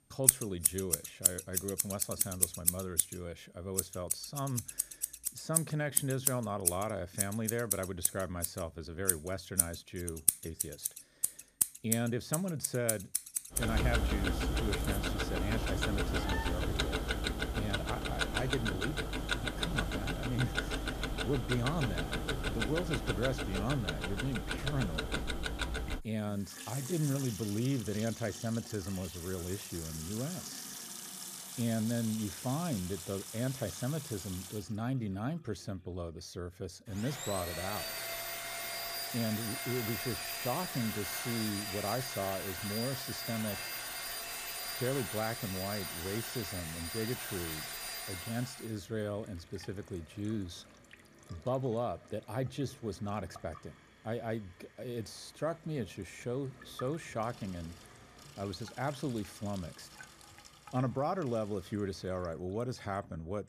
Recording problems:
household noises; very loud; throughout; 2 dB above the speech

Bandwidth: 14.5 kHz